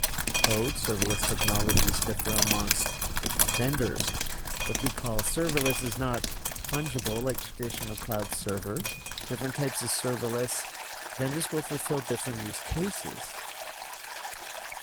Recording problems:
garbled, watery; slightly
rain or running water; very loud; throughout; 2 dB above the speech

